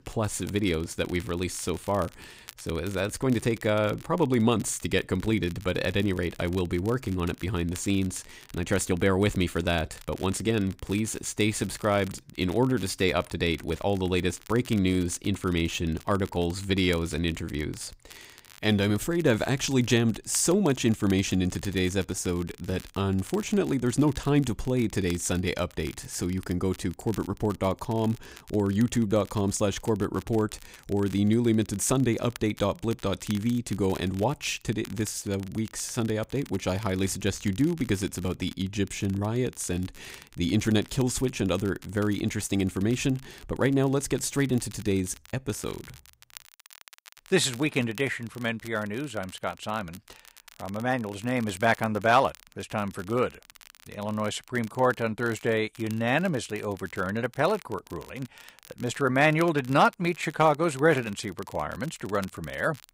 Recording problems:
crackle, like an old record; faint; 20 dB below the speech

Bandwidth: 15.5 kHz